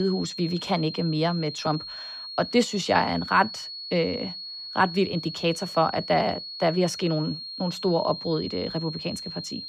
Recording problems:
high-pitched whine; loud; throughout; 4 kHz, 8 dB below the speech
abrupt cut into speech; at the start

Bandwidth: 15 kHz